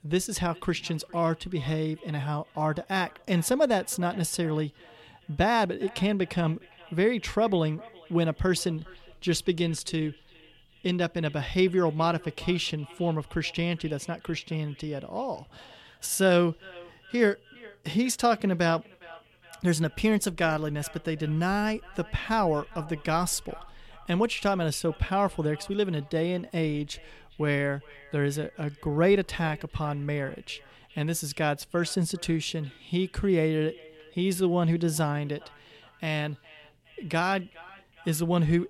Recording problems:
echo of what is said; faint; throughout; 410 ms later, 25 dB below the speech

